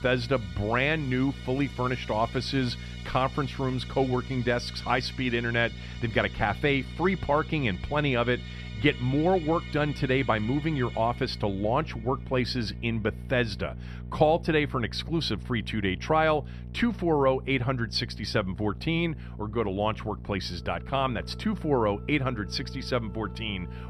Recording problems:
background music; noticeable; throughout; 20 dB below the speech
electrical hum; faint; throughout; 60 Hz, 25 dB below the speech

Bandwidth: 14 kHz